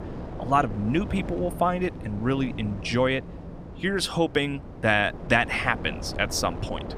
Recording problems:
wind noise on the microphone; occasional gusts; 15 dB below the speech

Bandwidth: 15 kHz